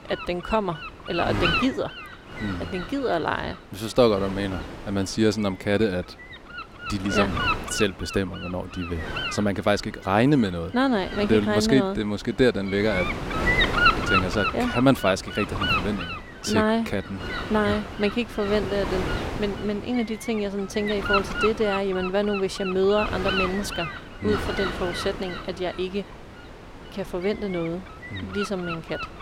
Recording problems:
wind noise on the microphone; heavy; 1 dB below the speech

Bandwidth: 16 kHz